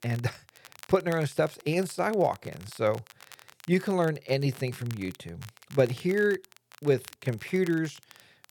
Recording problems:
crackle, like an old record; faint; 20 dB below the speech

